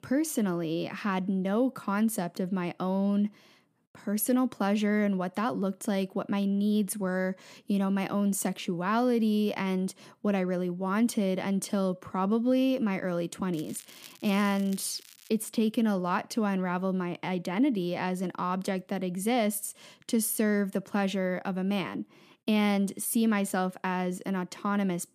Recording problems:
crackling; faint; from 14 to 15 s; 20 dB below the speech

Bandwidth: 15 kHz